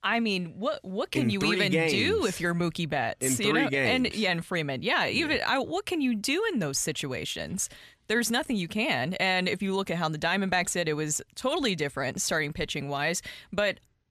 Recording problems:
none

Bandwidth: 14 kHz